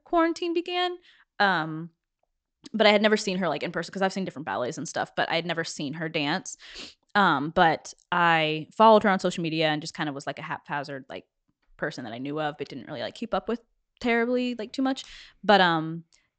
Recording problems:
high frequencies cut off; noticeable; nothing above 8 kHz

